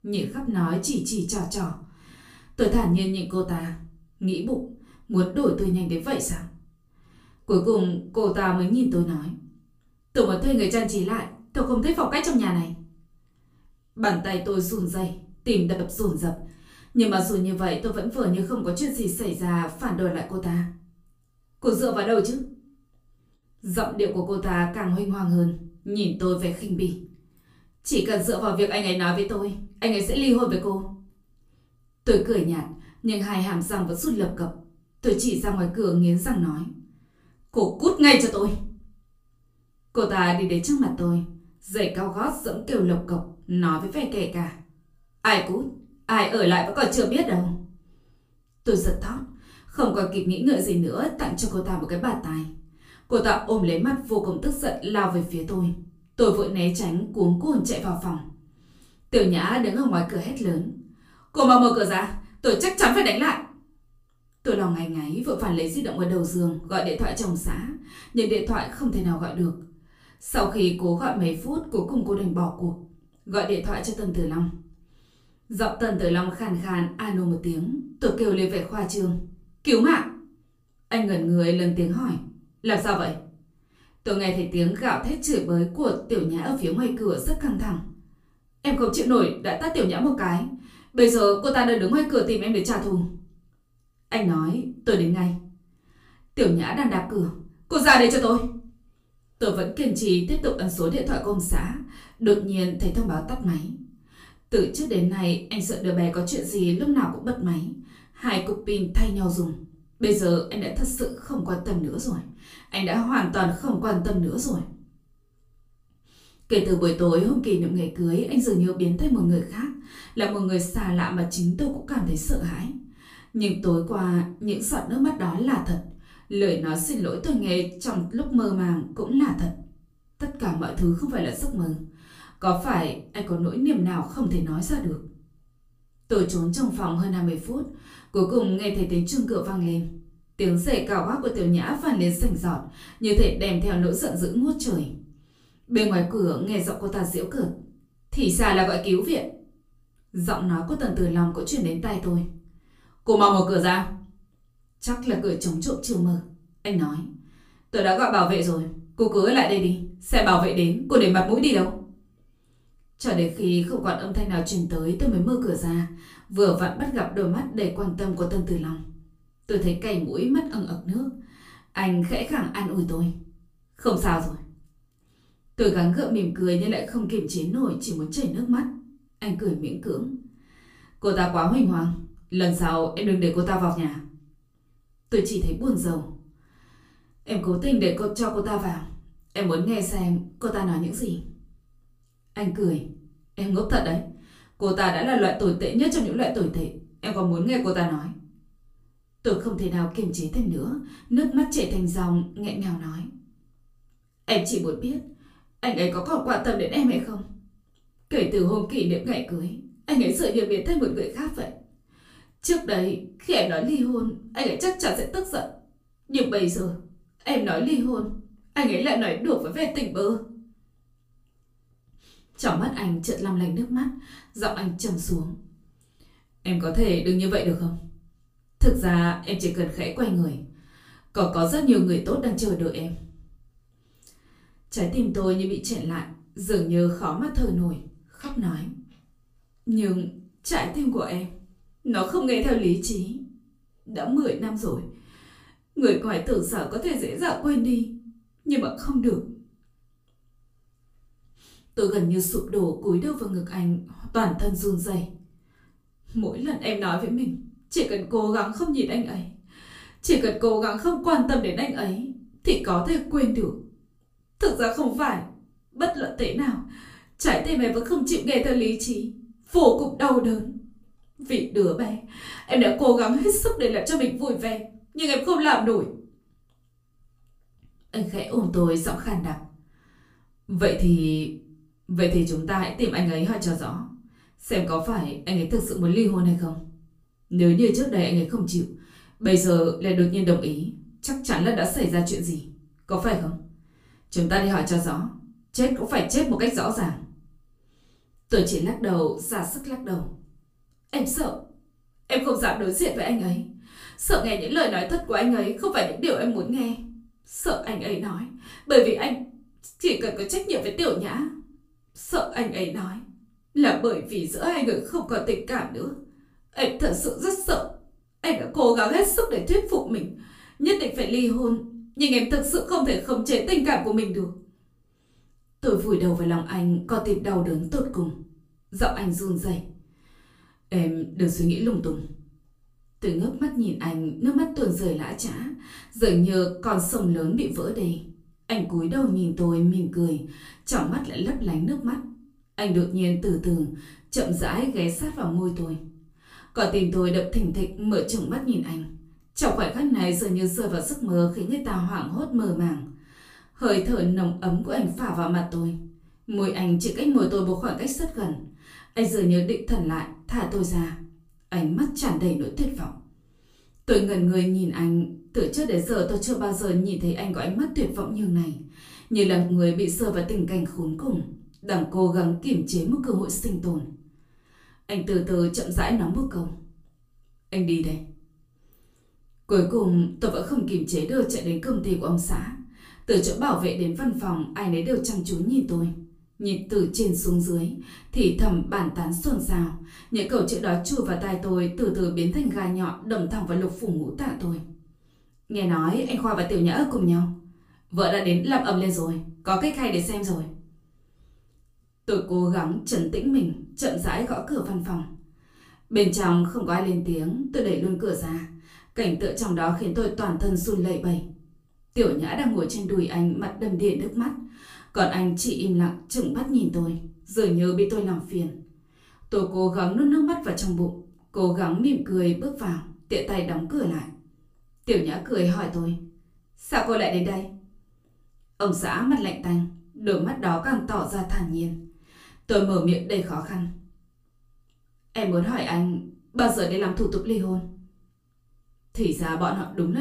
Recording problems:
off-mic speech; far
room echo; slight; dies away in 0.4 s
abrupt cut into speech; at the end

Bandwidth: 15 kHz